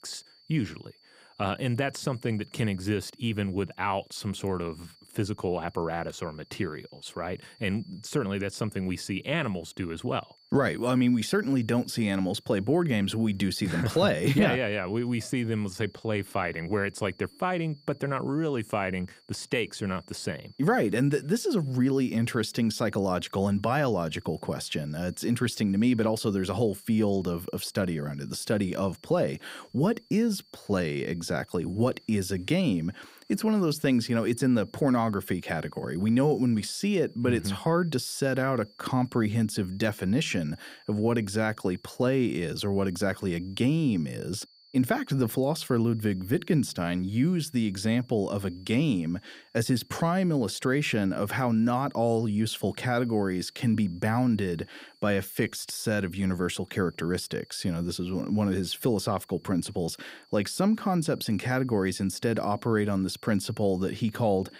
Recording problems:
high-pitched whine; faint; throughout; 4.5 kHz, 30 dB below the speech

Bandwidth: 15.5 kHz